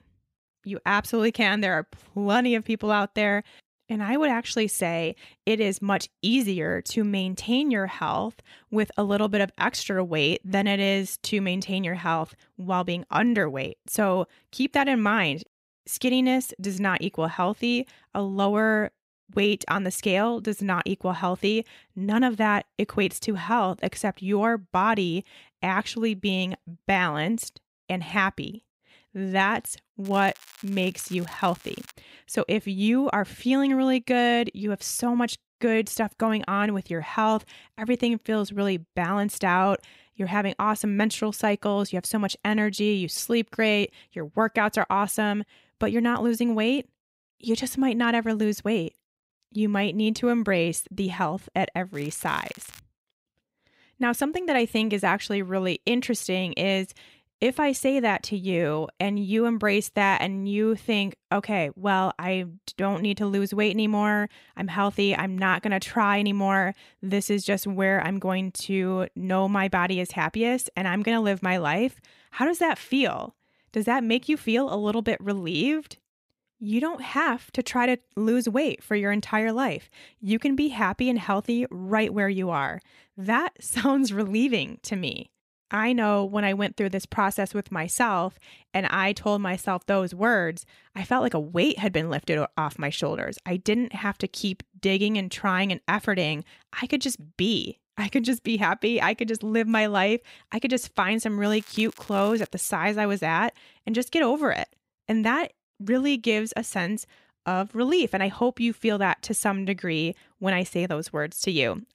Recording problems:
crackling; faint; from 30 to 32 s, at 52 s and from 1:41 to 1:42; 20 dB below the speech

